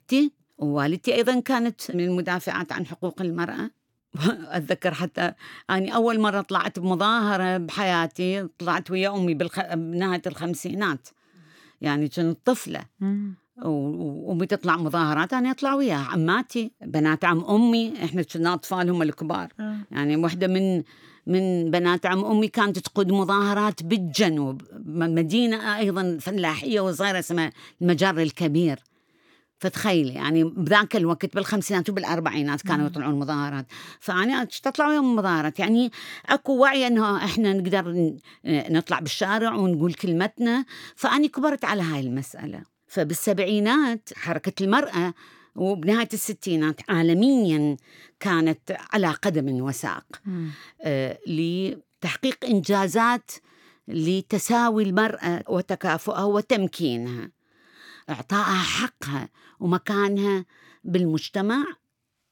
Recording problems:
none

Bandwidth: 18 kHz